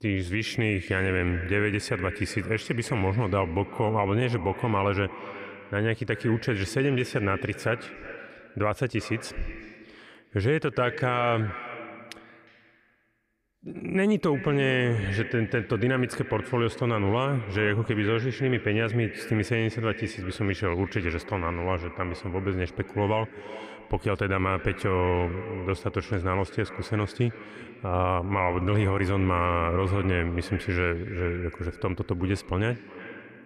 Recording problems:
echo of what is said; noticeable; throughout; 360 ms later, 15 dB below the speech

